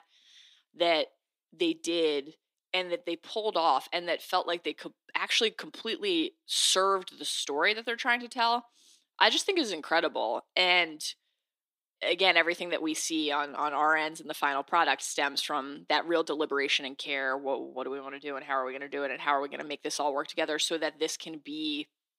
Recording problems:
thin; somewhat; fading below 300 Hz

